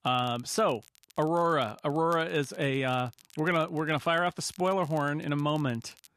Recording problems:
crackle, like an old record; faint; 25 dB below the speech

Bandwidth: 14 kHz